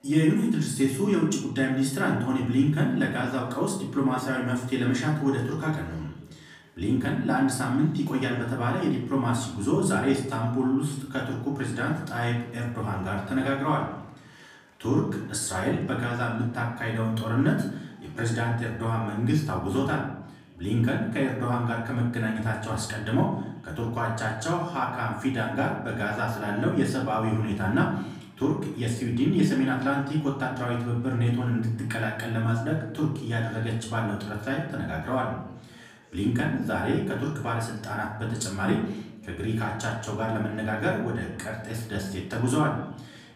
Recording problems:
off-mic speech; far
room echo; slight; dies away in 0.7 s
chatter from many people; faint; throughout; 30 dB below the speech

